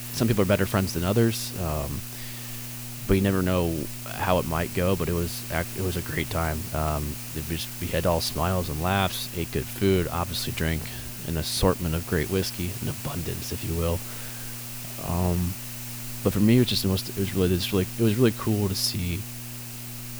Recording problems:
hiss; loud; throughout; 9 dB below the speech
electrical hum; faint; throughout; 60 Hz, 20 dB below the speech

